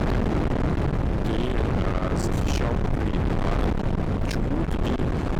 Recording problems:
distortion; heavy; 8 dB below the speech
wind noise on the microphone; heavy; 1 dB above the speech

